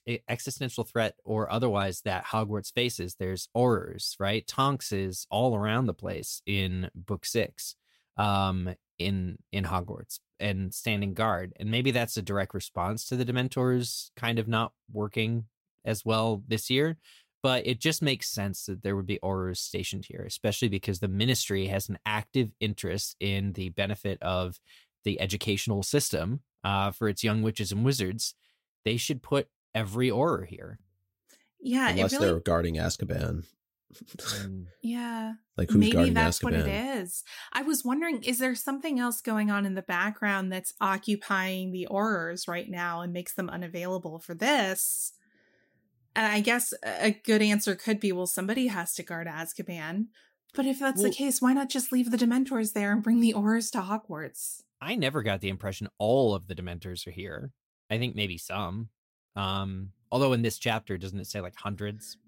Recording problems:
none

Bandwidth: 16 kHz